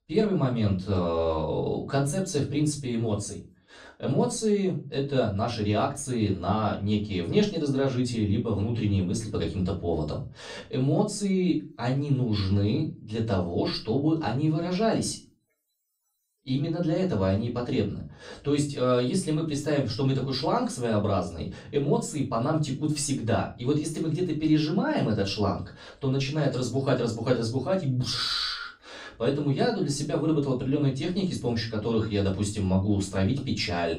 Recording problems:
off-mic speech; far
room echo; slight; dies away in 0.3 s

